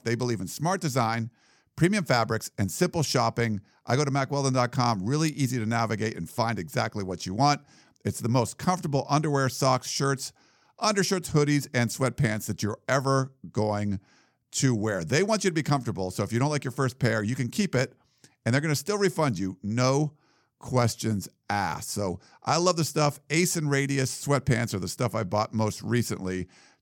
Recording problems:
none

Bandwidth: 17.5 kHz